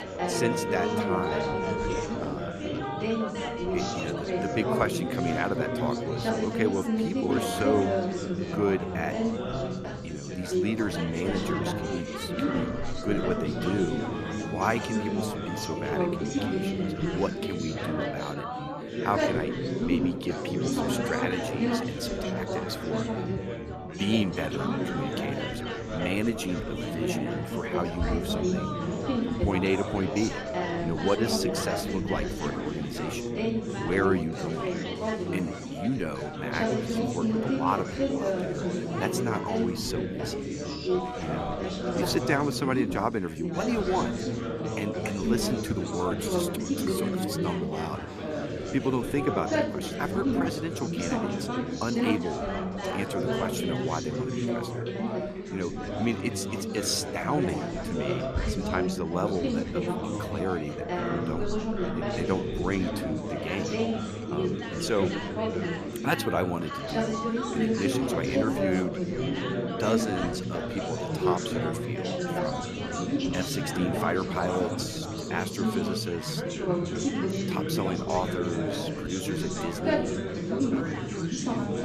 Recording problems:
chatter from many people; very loud; throughout; 2 dB above the speech
background music; loud; throughout; 9 dB below the speech

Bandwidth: 14.5 kHz